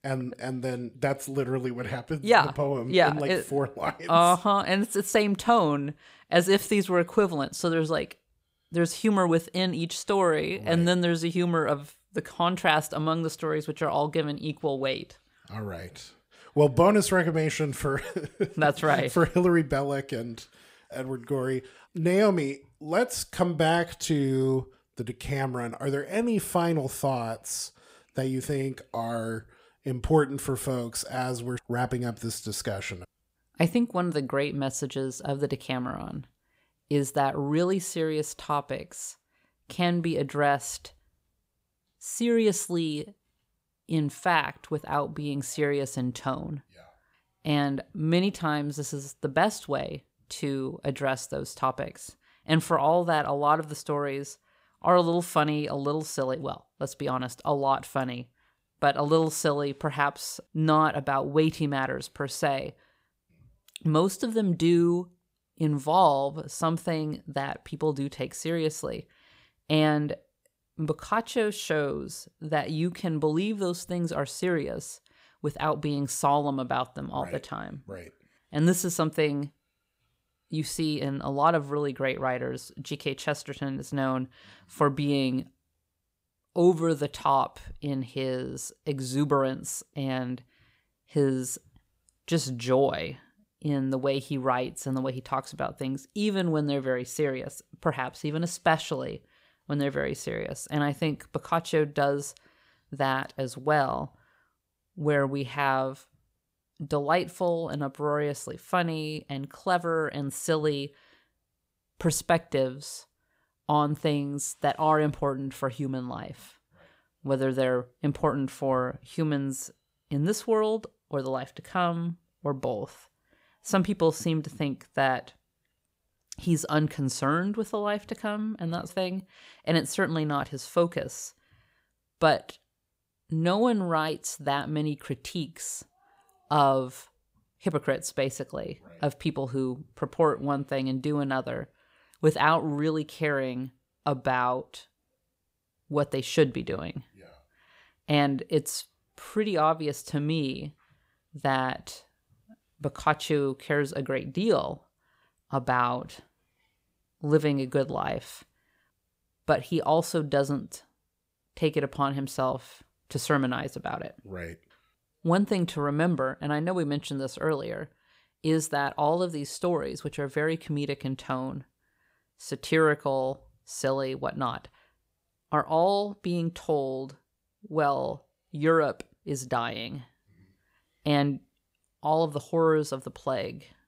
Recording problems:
none

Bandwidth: 15.5 kHz